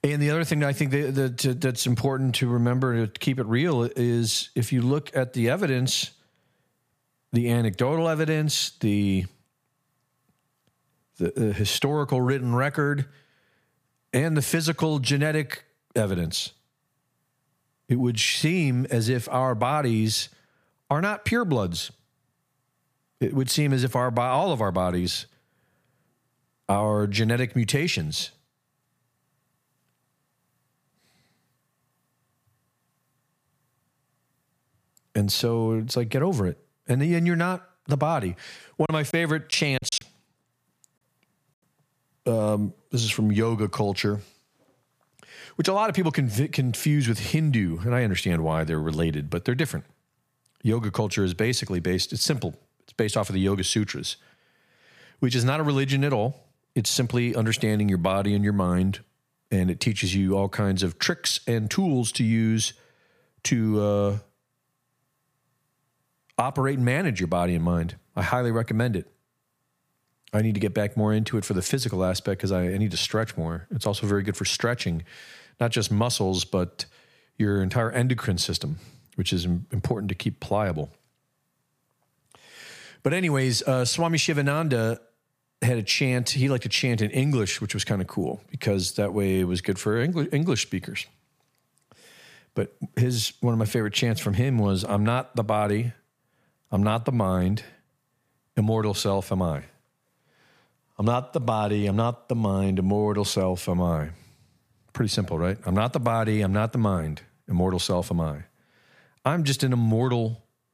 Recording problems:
choppy; very; from 39 to 40 s; 9% of the speech affected

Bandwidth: 15 kHz